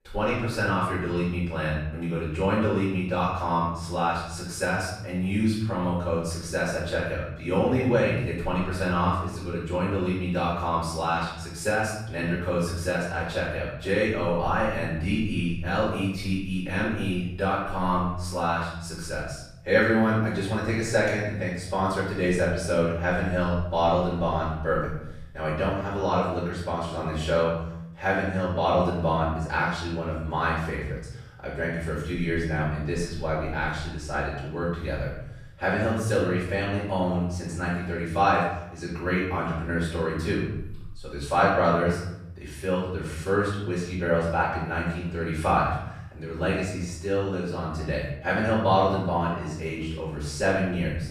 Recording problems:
off-mic speech; far
room echo; noticeable; dies away in 0.9 s

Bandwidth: 14.5 kHz